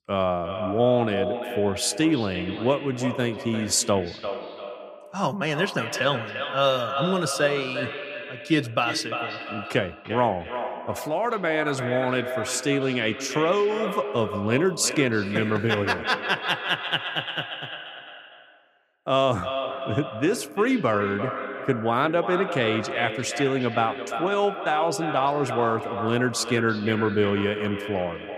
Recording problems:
echo of what is said; strong; throughout; 350 ms later, 7 dB below the speech

